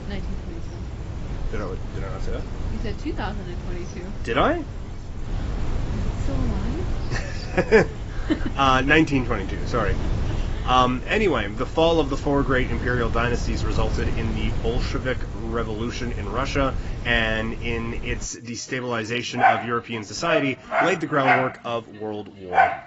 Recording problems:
garbled, watery; badly; nothing above 7.5 kHz
animal sounds; very loud; throughout; 2 dB above the speech
wind noise on the microphone; occasional gusts; until 18 s; 15 dB below the speech

